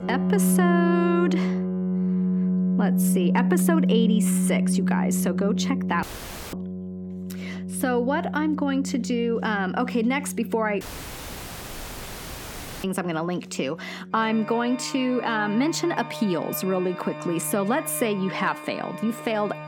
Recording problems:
background music; loud; throughout; 1 dB below the speech
audio cutting out; at 6 s for 0.5 s and at 11 s for 2 s

